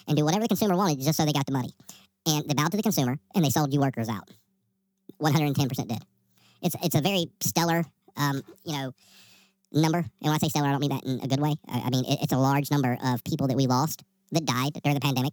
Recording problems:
wrong speed and pitch; too fast and too high; 1.6 times normal speed

